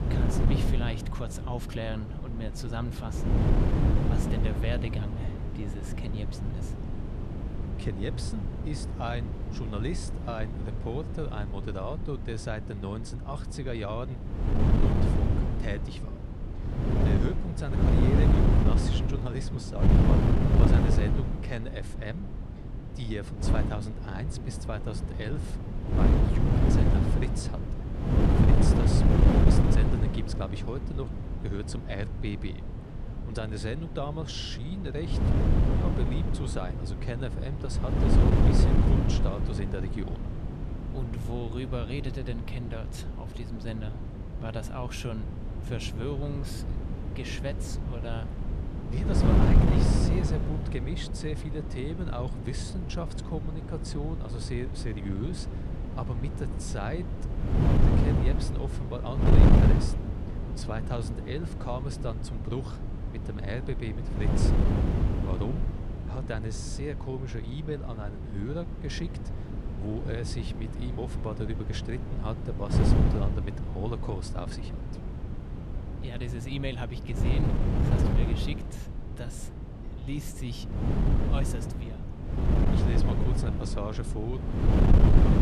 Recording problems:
wind noise on the microphone; heavy; 2 dB above the speech

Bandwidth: 13.5 kHz